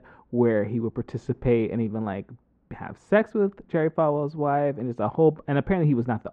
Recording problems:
muffled; very; fading above 1 kHz

